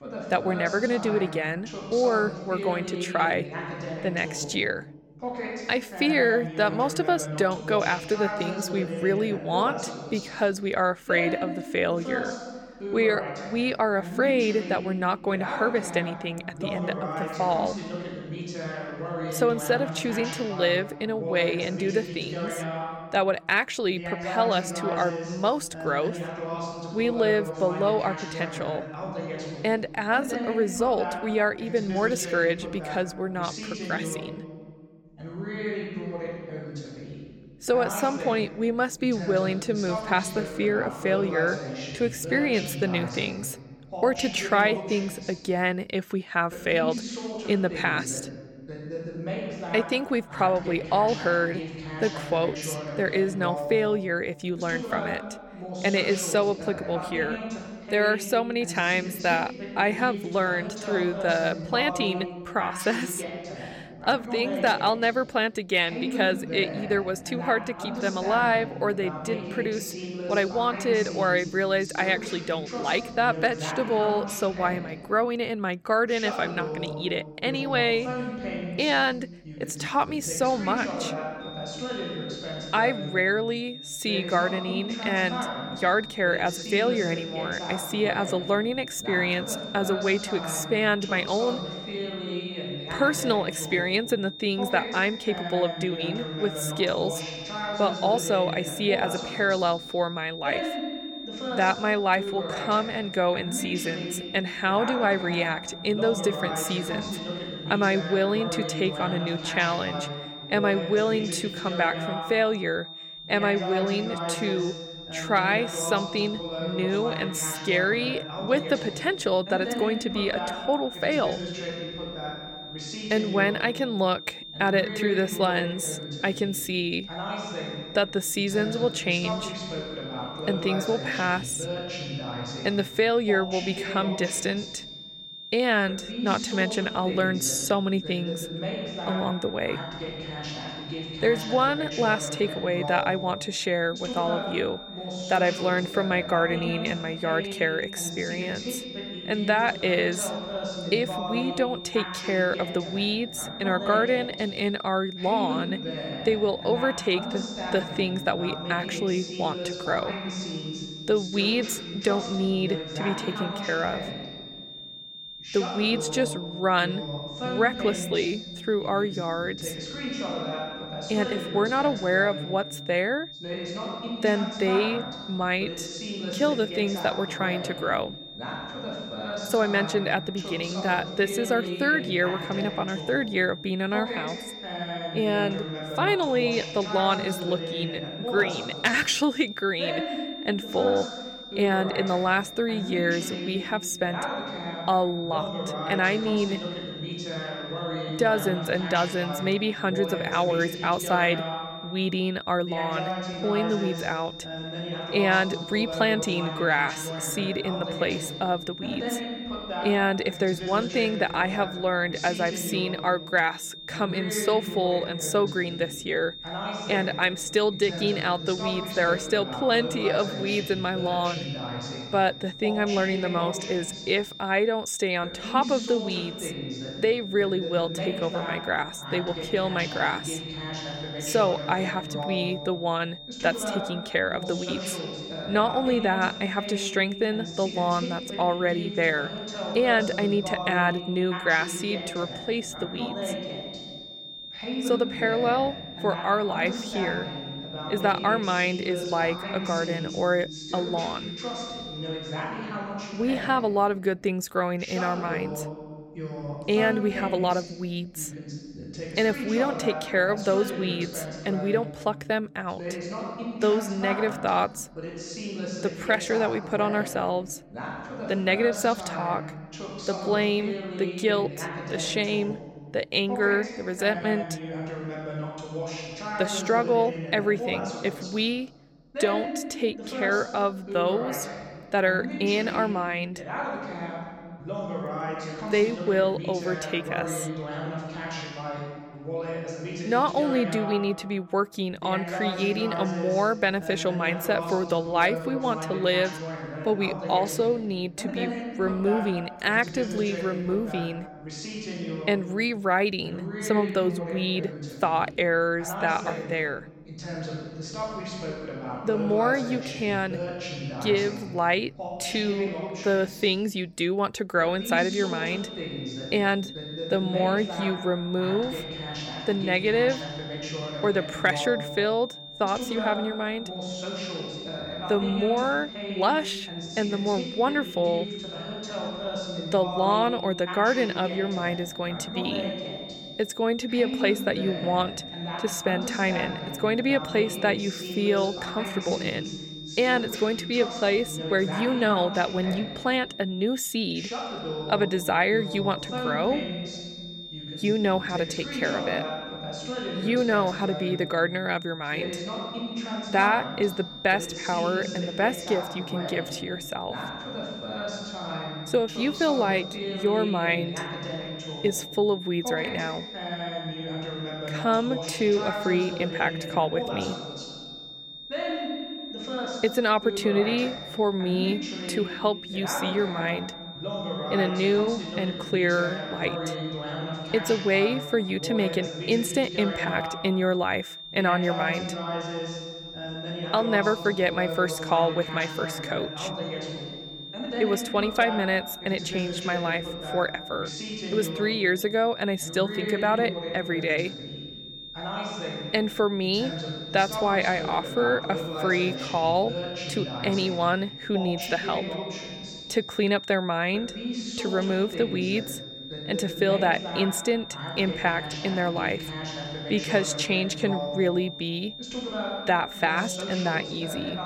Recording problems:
voice in the background; loud; throughout; 8 dB below the speech
high-pitched whine; noticeable; from 1:21 to 4:12 and from 5:15 on; 3.5 kHz, 15 dB below the speech

